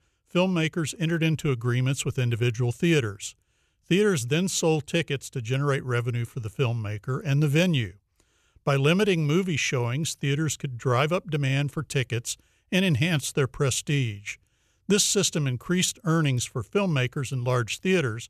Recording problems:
none

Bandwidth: 14 kHz